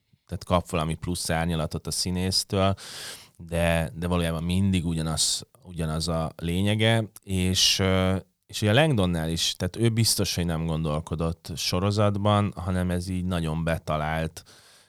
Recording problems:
none

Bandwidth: 18.5 kHz